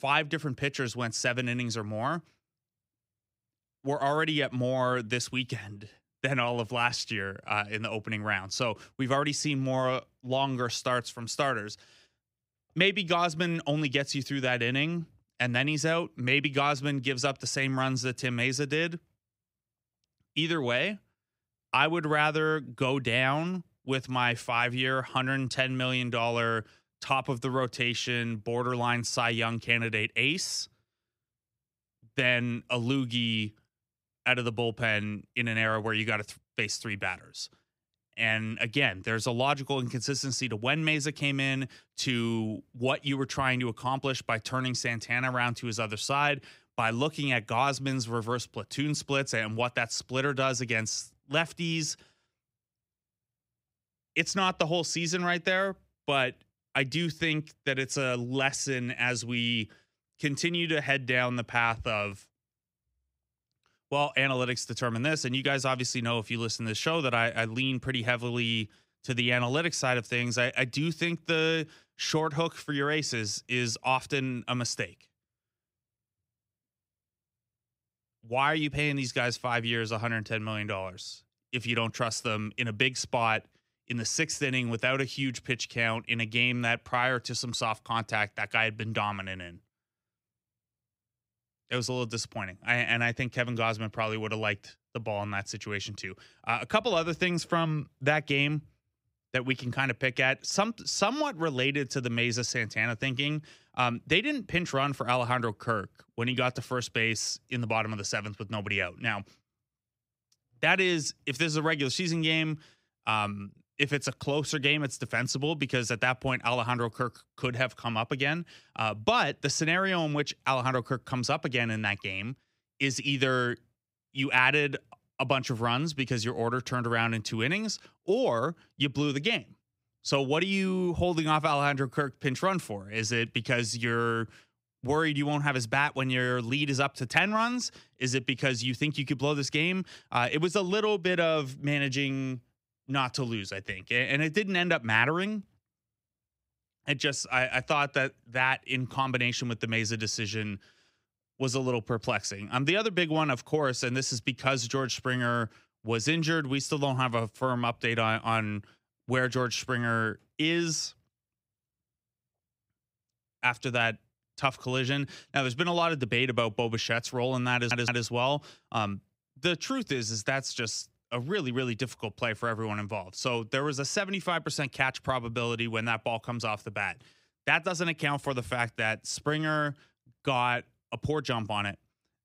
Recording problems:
audio stuttering; at 2:48

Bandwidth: 15.5 kHz